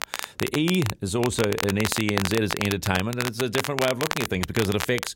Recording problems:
crackle, like an old record; loud; 5 dB below the speech

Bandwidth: 16 kHz